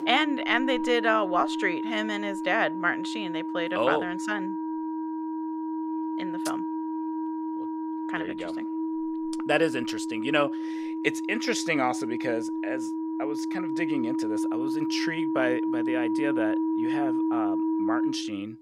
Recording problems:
background music; loud; throughout; 1 dB below the speech

